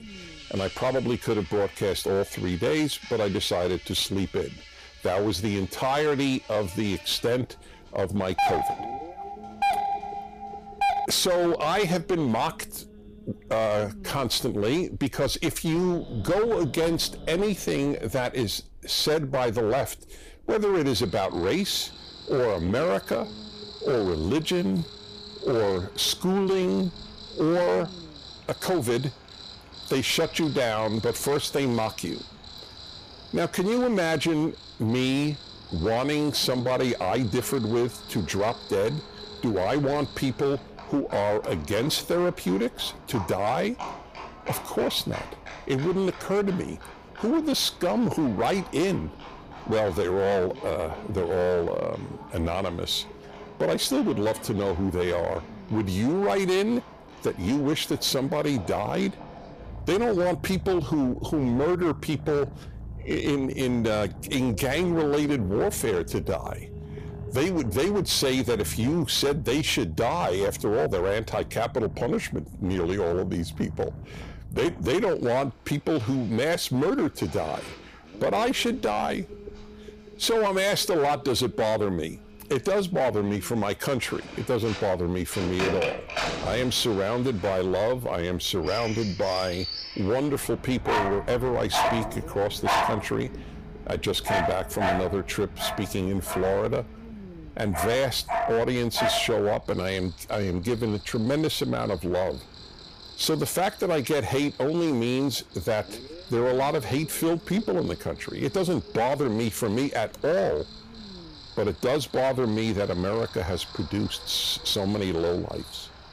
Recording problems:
distortion; slight; 12% of the sound clipped
animal sounds; noticeable; throughout; 10 dB below the speech
low rumble; faint; throughout; 25 dB below the speech
doorbell; loud; from 8.5 to 11 s; peak 2 dB above the speech

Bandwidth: 15 kHz